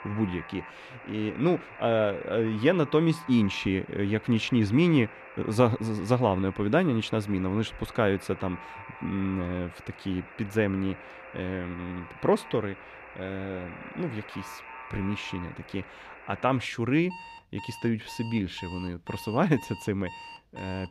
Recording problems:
alarms or sirens; noticeable; throughout; 15 dB below the speech

